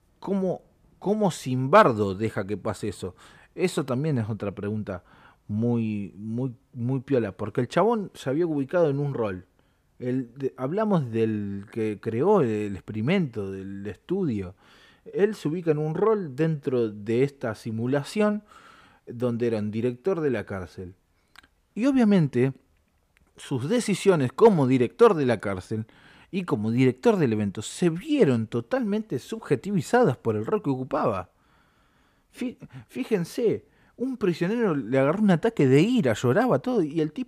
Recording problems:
none

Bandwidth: 15 kHz